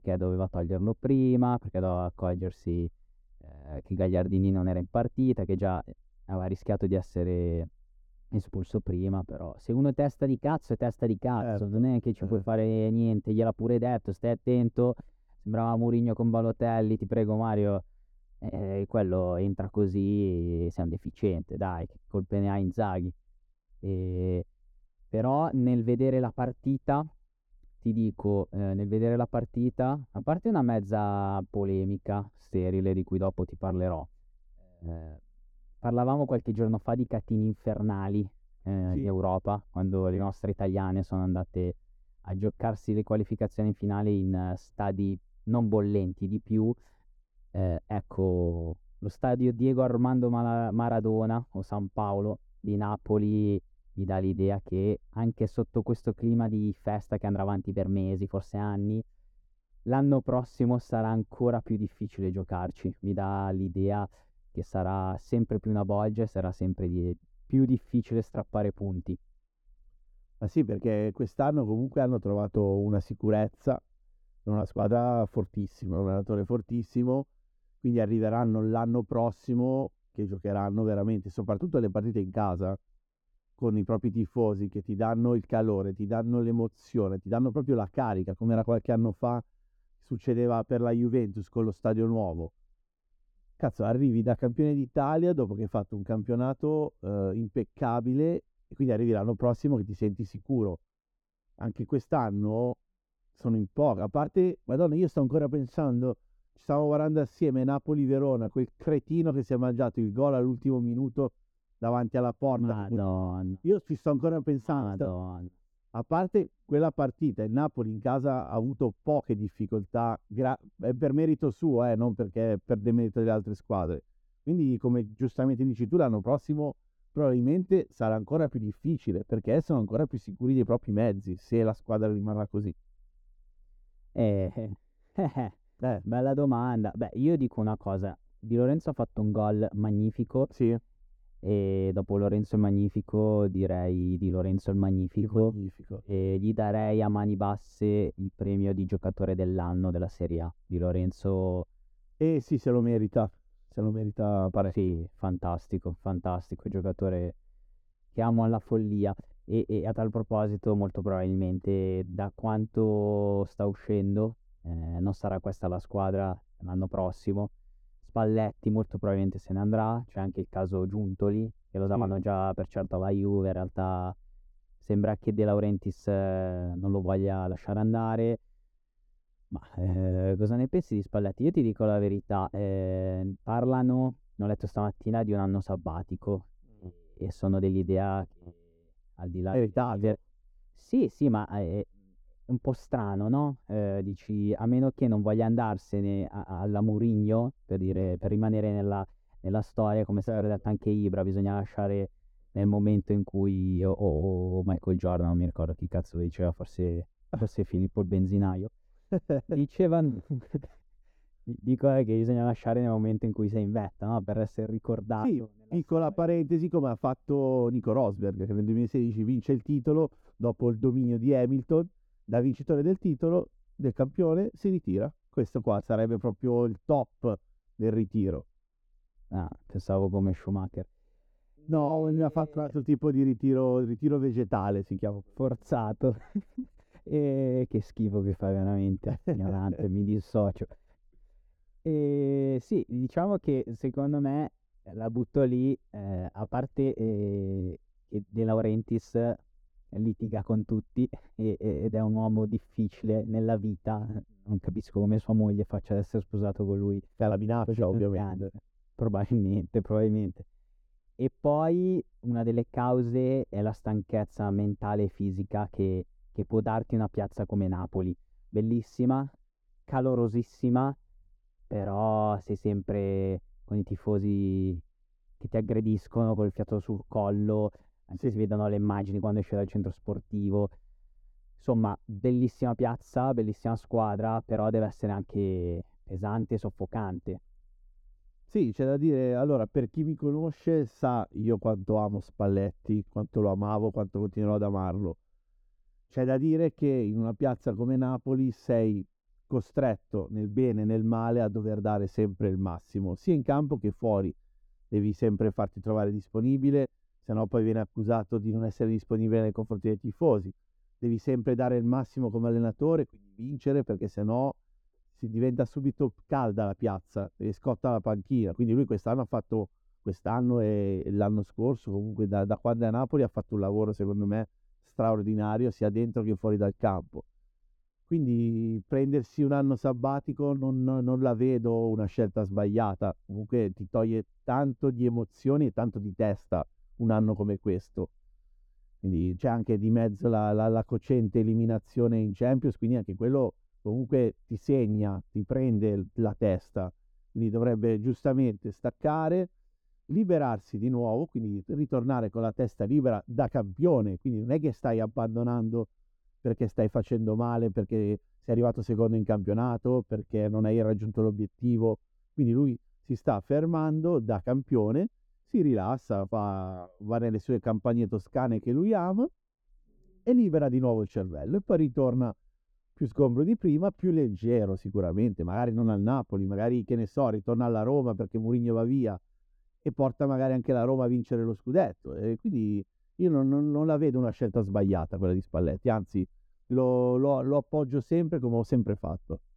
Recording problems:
muffled; very; fading above 1 kHz

